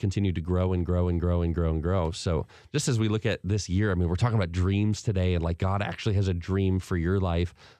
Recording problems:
none

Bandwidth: 14.5 kHz